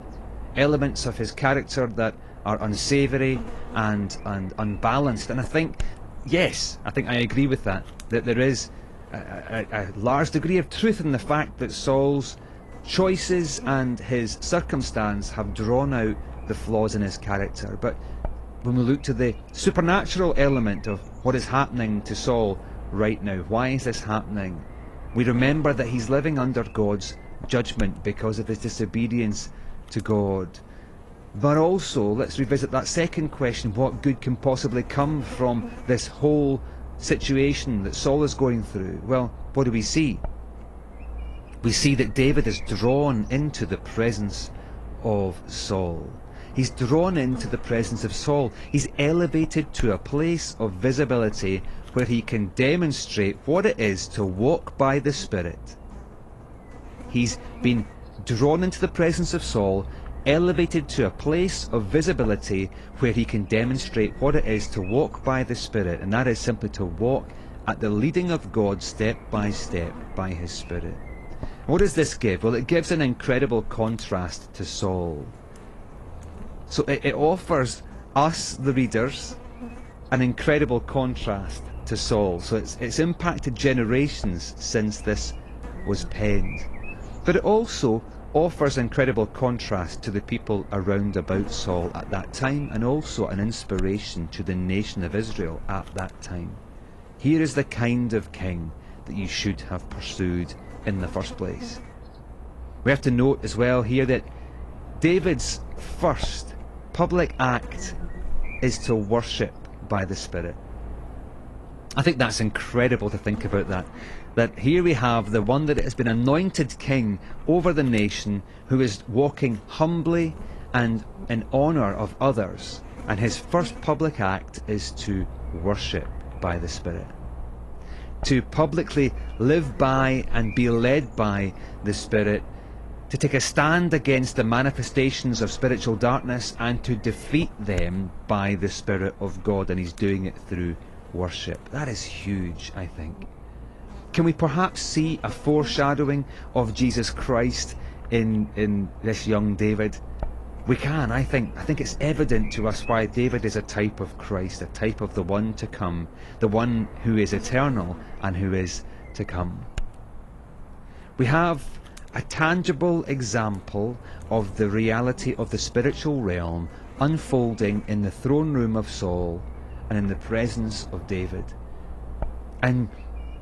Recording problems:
garbled, watery; slightly
electrical hum; noticeable; throughout; 50 Hz, 20 dB below the speech

